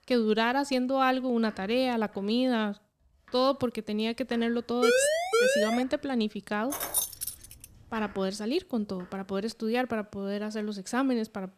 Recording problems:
household noises; faint; throughout; 25 dB below the speech
siren; loud; from 5 to 6 s; peak 5 dB above the speech
jangling keys; loud; at 6.5 s; peak 1 dB above the speech

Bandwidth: 14 kHz